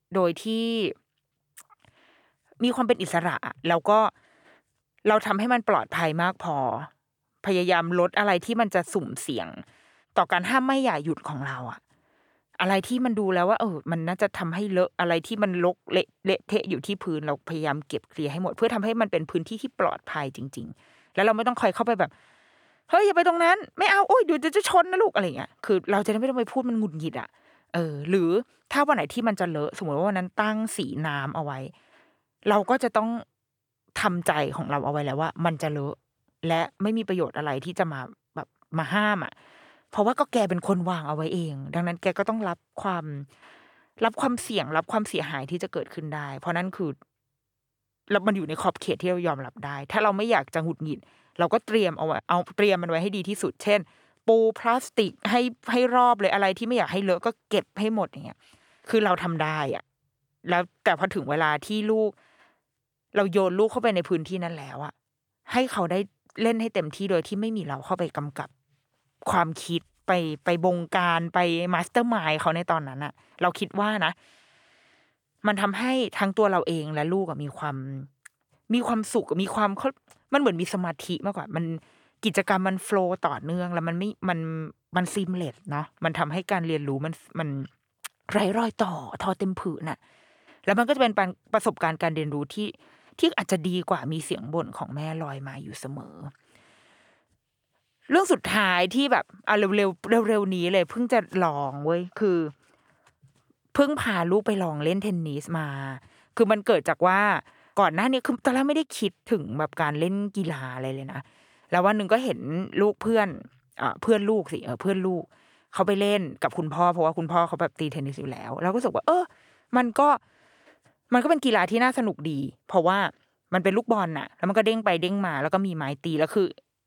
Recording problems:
none

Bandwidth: 18.5 kHz